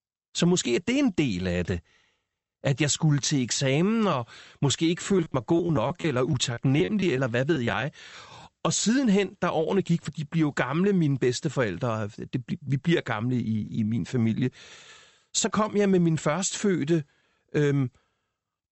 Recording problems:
high frequencies cut off; noticeable; nothing above 8 kHz
choppy; very; from 5 to 8.5 s; 10% of the speech affected

